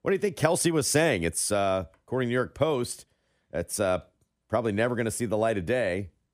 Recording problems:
none

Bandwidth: 15 kHz